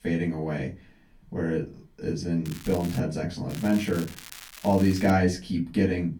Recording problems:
off-mic speech; far
room echo; very slight; dies away in 0.2 s
crackling; noticeable; at 2.5 s and from 3.5 to 5 s; 15 dB below the speech

